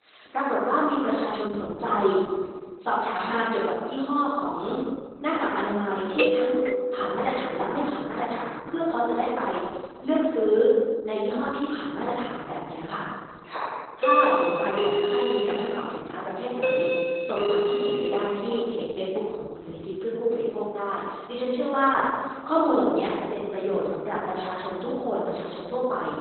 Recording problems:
off-mic speech; far
garbled, watery; badly; nothing above 4 kHz
room echo; noticeable; dies away in 1.4 s
thin; somewhat; fading below 400 Hz
doorbell; loud; from 6 to 8 s and from 14 to 19 s; peak 5 dB above the speech

